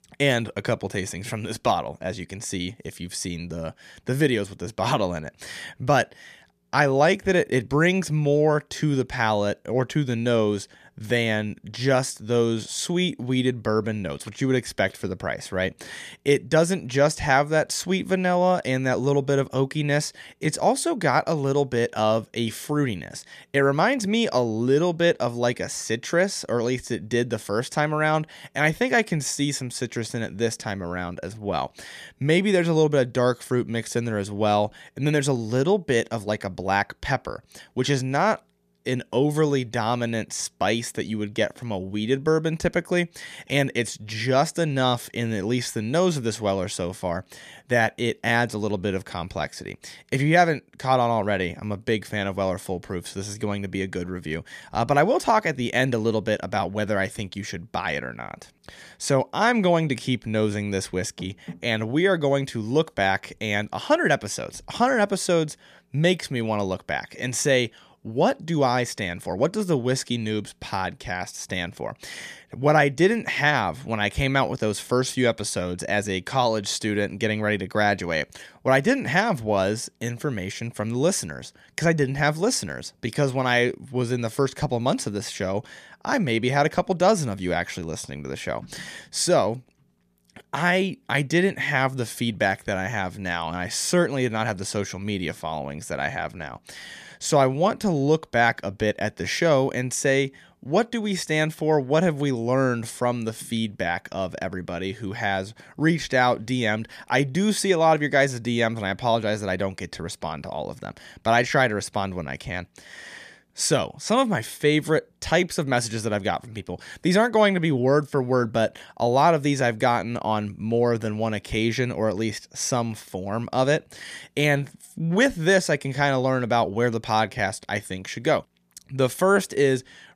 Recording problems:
none

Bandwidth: 14.5 kHz